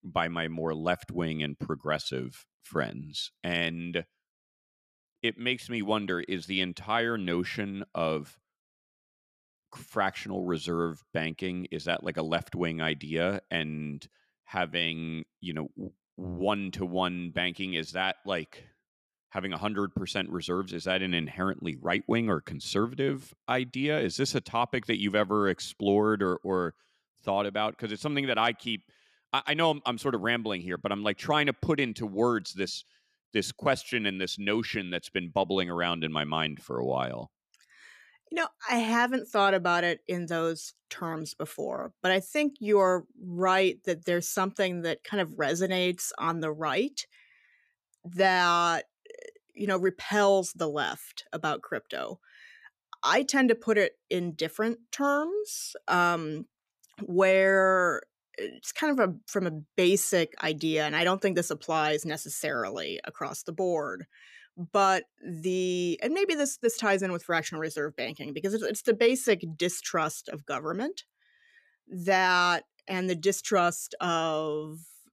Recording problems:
none

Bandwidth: 14.5 kHz